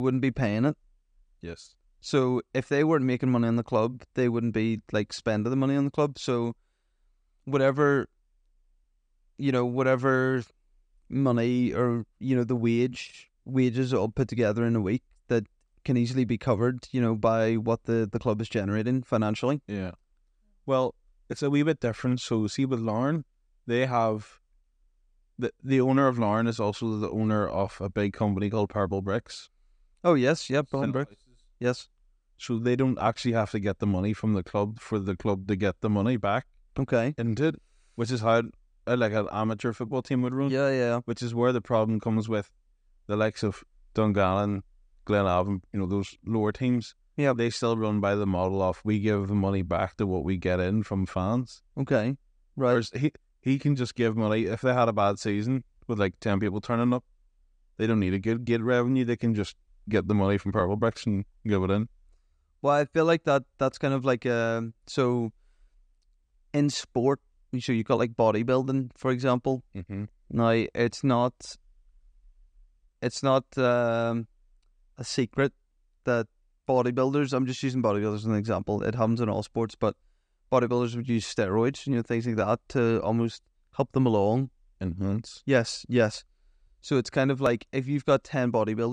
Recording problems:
abrupt cut into speech; at the start and the end

